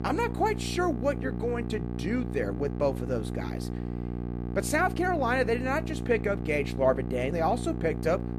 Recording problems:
electrical hum; noticeable; throughout; 60 Hz, 10 dB below the speech

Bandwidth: 14.5 kHz